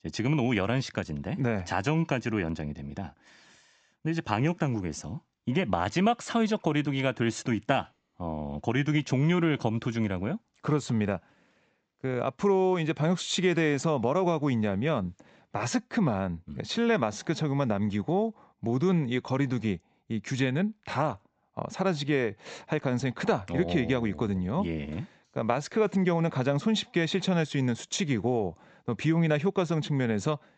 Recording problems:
high frequencies cut off; noticeable; nothing above 8 kHz

